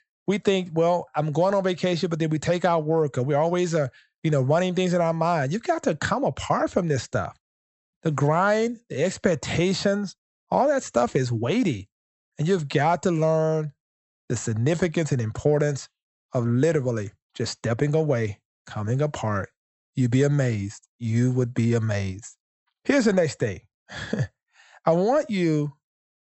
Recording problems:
high frequencies cut off; noticeable; nothing above 8 kHz

